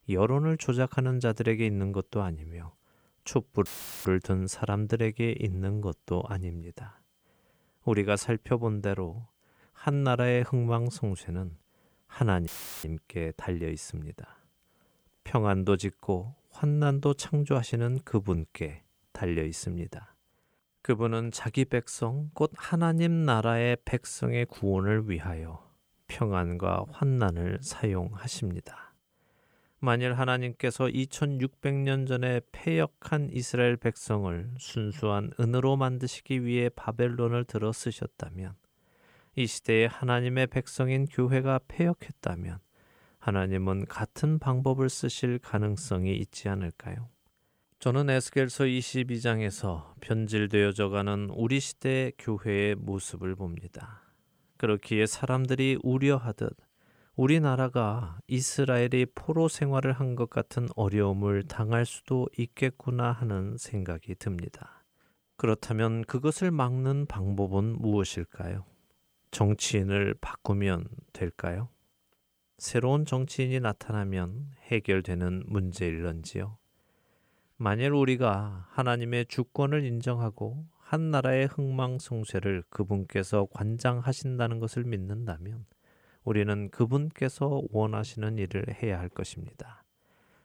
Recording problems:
audio cutting out; filled with static; at 3.5 s and at 12 s

